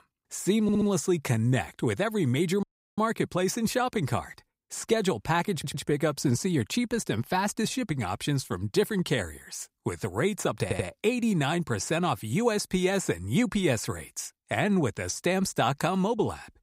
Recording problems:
audio stuttering; at 0.5 s, at 5.5 s and at 11 s
audio cutting out; at 2.5 s

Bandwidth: 15.5 kHz